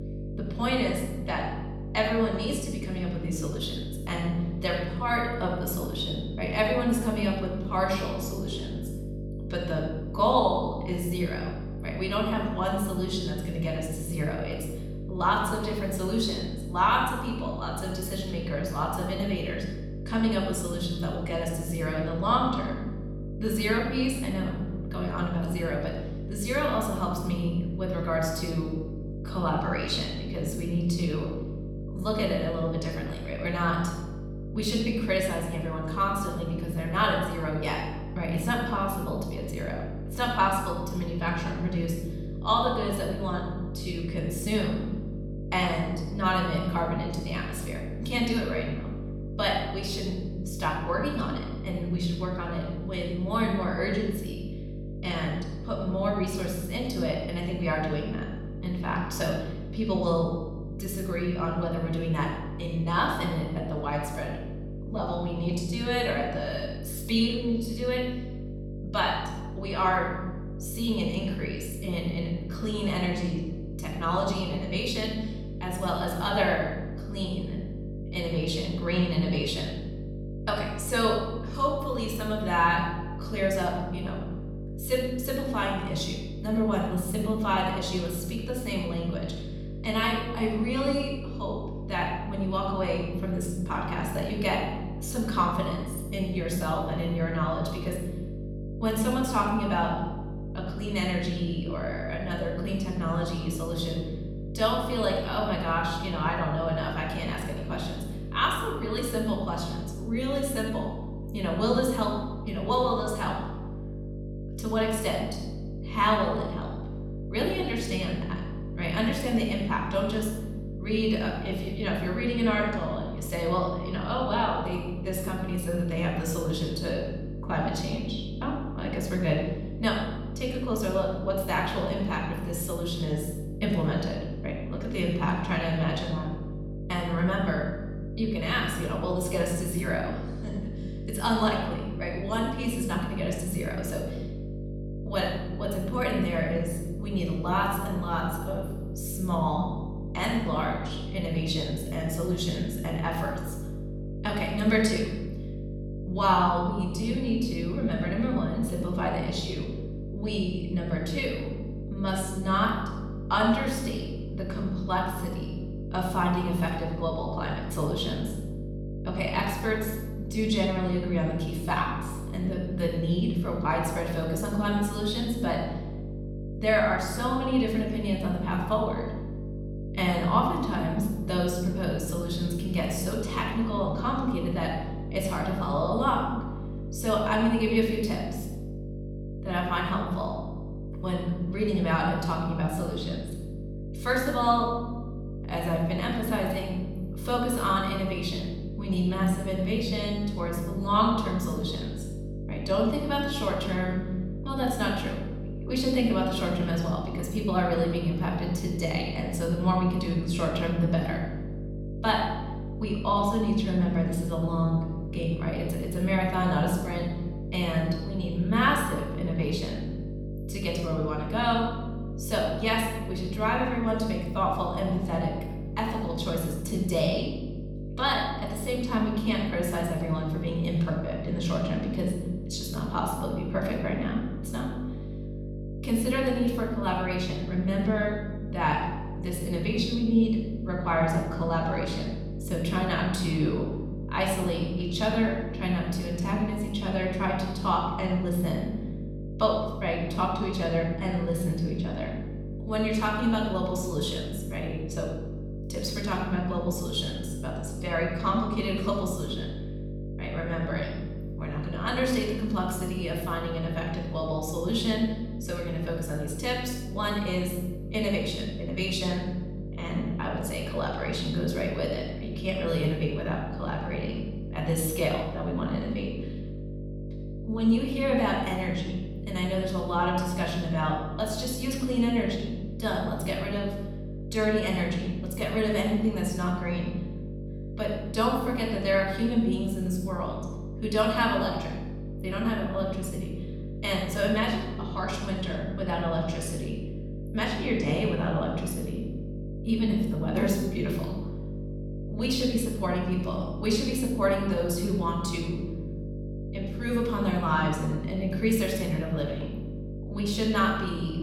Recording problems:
room echo; noticeable; dies away in 1 s
off-mic speech; somewhat distant
electrical hum; noticeable; throughout; 50 Hz, 15 dB below the speech

